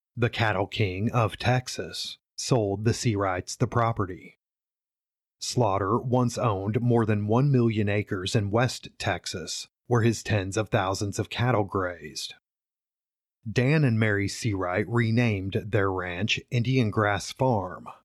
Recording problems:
none

